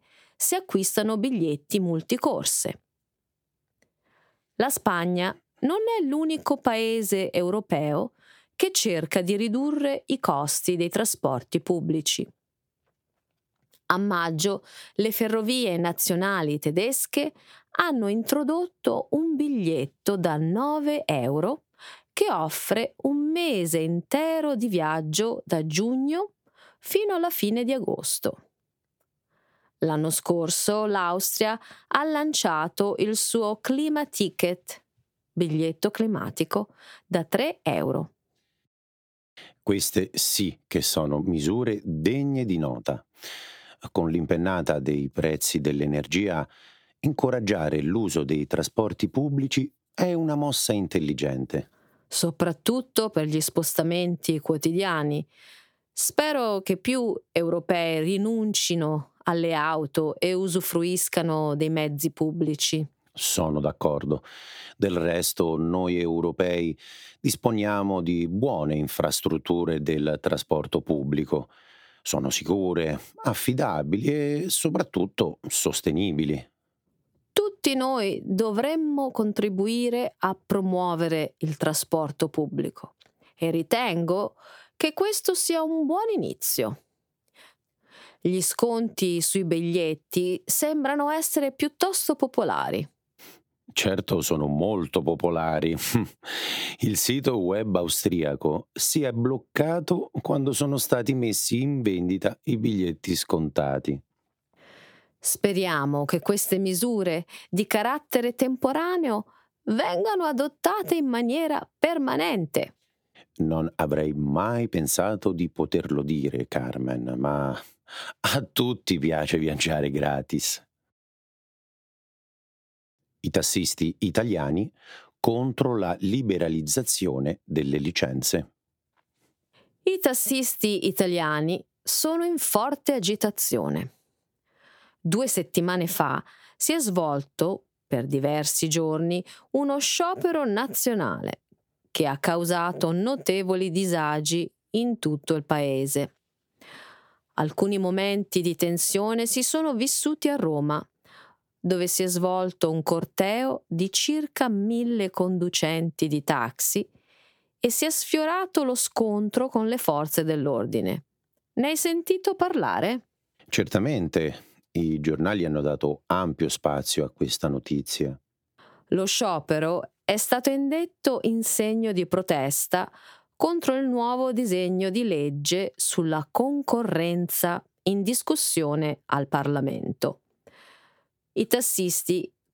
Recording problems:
squashed, flat; somewhat

